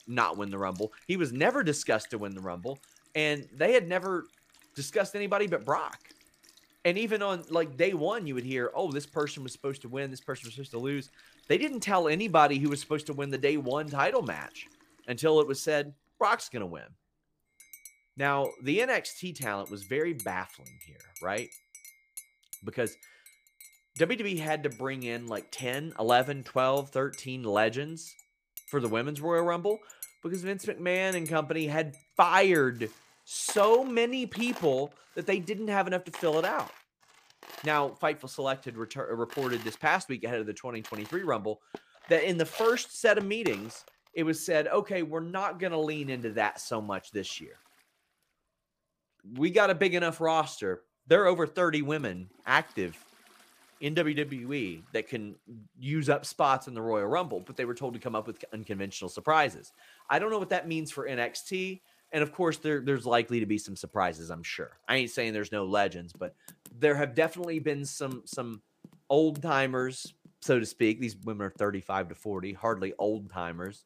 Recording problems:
household noises; faint; throughout; 20 dB below the speech

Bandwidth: 15 kHz